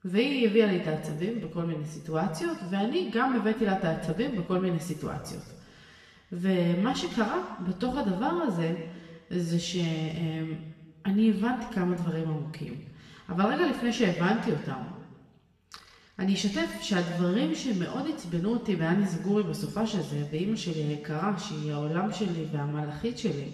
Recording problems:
off-mic speech; far
room echo; noticeable; dies away in 1.3 s

